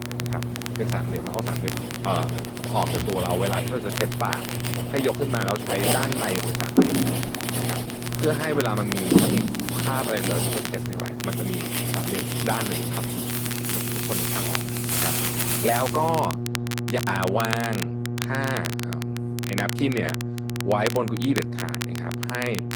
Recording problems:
garbled, watery; slightly
household noises; very loud; until 16 s; as loud as the speech
electrical hum; loud; throughout; 60 Hz, 9 dB below the speech
crackle, like an old record; loud; 6 dB below the speech
keyboard typing; faint; at 15 s; peak 15 dB below the speech

